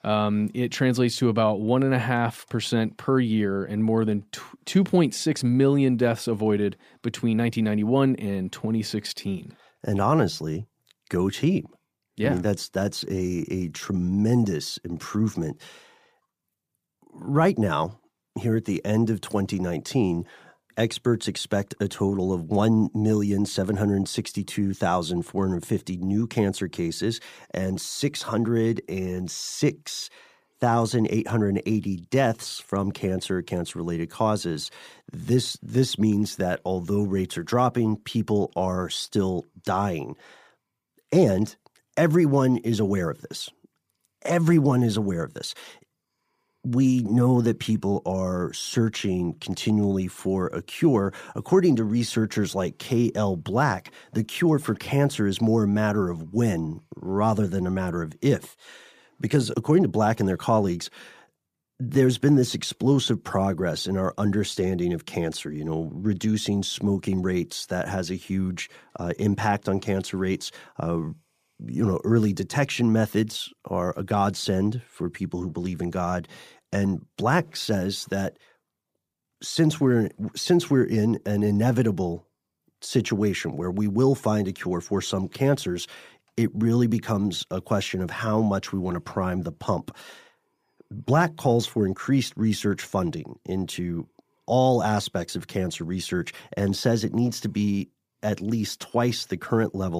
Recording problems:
abrupt cut into speech; at the end

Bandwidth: 15 kHz